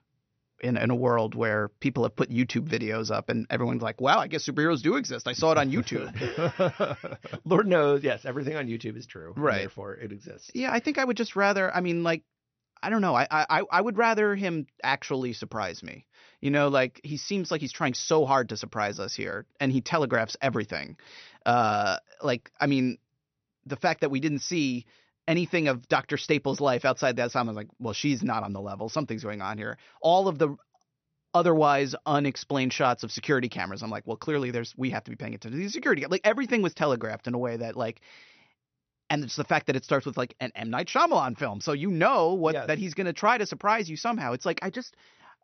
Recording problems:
high frequencies cut off; noticeable; nothing above 6 kHz

